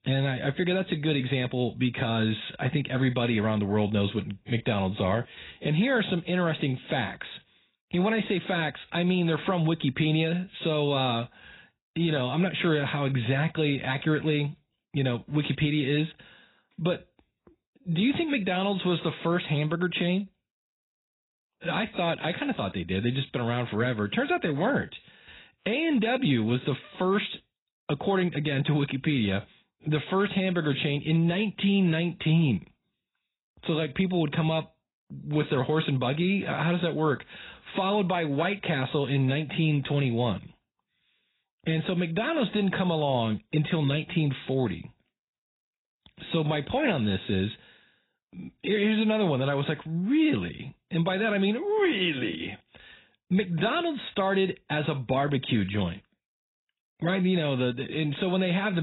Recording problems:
garbled, watery; badly; nothing above 4 kHz
abrupt cut into speech; at the end

